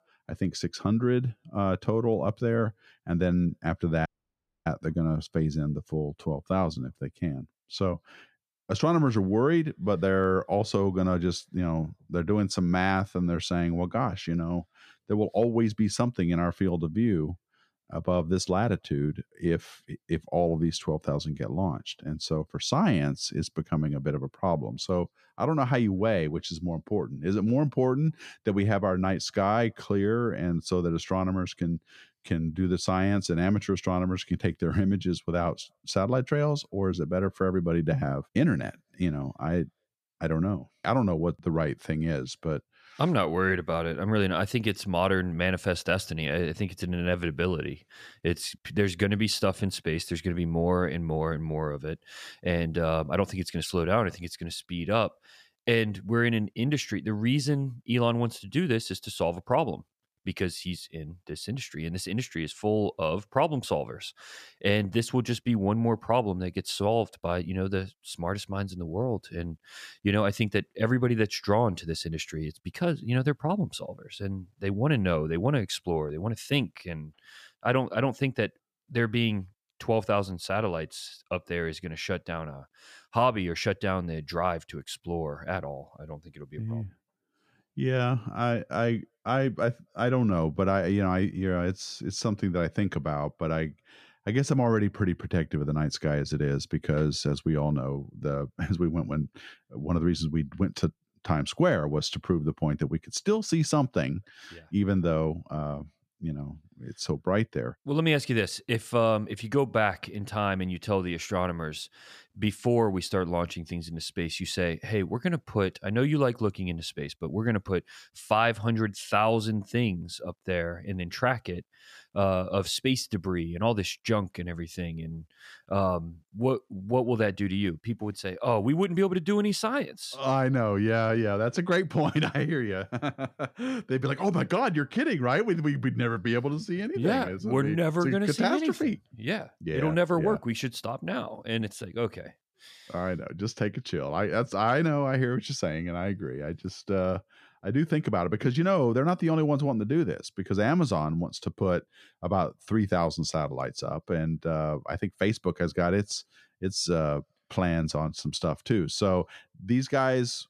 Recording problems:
audio cutting out; at 4 s for 0.5 s

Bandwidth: 14.5 kHz